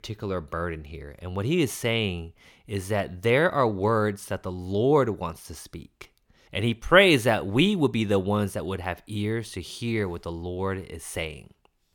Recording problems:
none

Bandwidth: 18 kHz